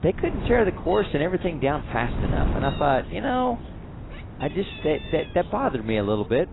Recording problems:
garbled, watery; badly; nothing above 4 kHz
animal sounds; noticeable; throughout; 20 dB below the speech
wind noise on the microphone; occasional gusts; 15 dB below the speech

